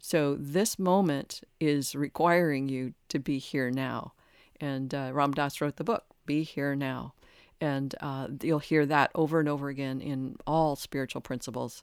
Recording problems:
none

